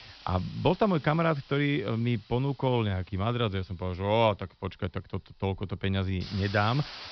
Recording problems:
high frequencies cut off; noticeable; nothing above 5.5 kHz
hiss; noticeable; throughout; 15 dB below the speech

